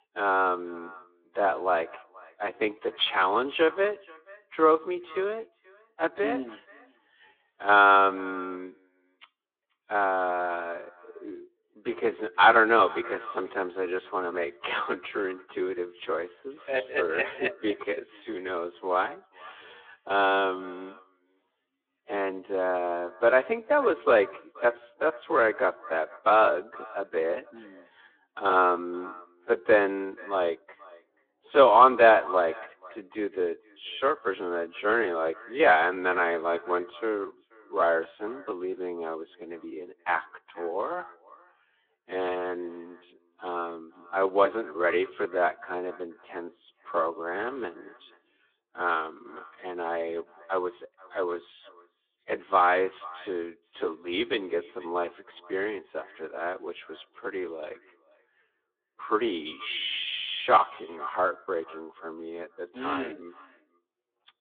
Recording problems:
wrong speed, natural pitch; too slow; 0.6 times normal speed
echo of what is said; faint; throughout; 480 ms later, 20 dB below the speech
phone-call audio; nothing above 3.5 kHz

